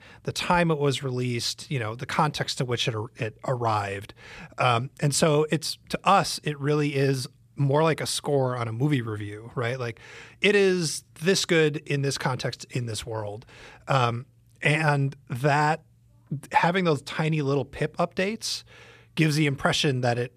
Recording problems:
none

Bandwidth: 14.5 kHz